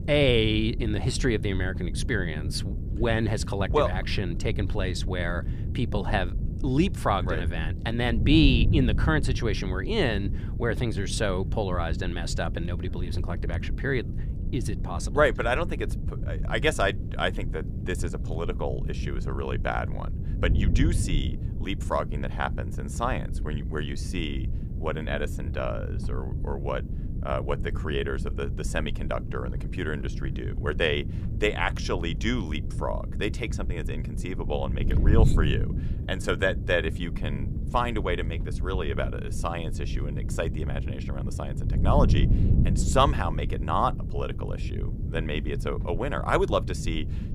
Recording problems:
wind noise on the microphone; occasional gusts; 15 dB below the speech

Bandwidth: 15 kHz